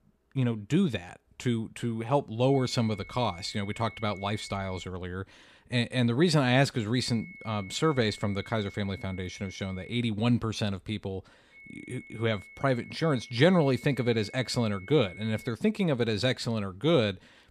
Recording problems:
high-pitched whine; noticeable; from 2.5 to 5 s, from 7 to 10 s and from 12 to 16 s; 2 kHz, 20 dB below the speech

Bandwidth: 14.5 kHz